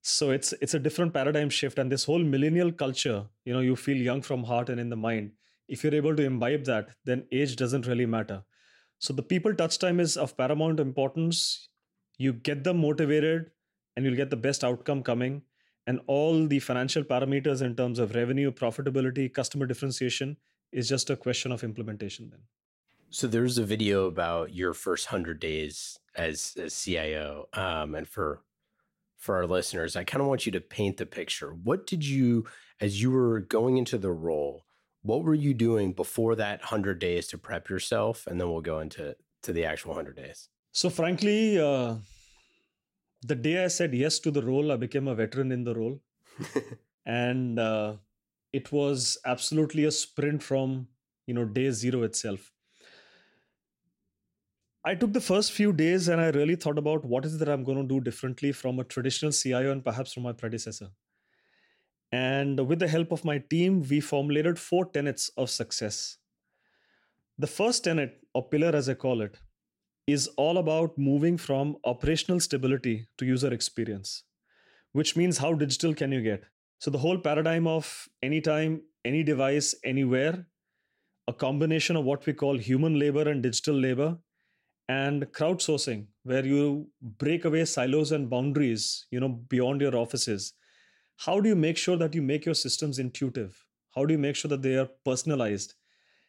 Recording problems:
none

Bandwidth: 16 kHz